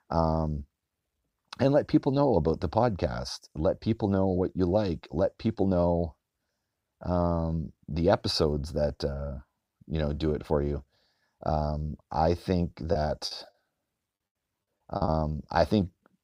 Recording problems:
choppy; very; from 13 to 15 s; 20% of the speech affected

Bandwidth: 15.5 kHz